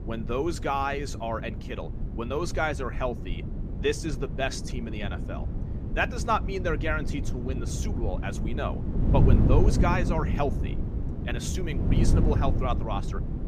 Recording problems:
wind noise on the microphone; heavy; 9 dB below the speech

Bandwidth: 14.5 kHz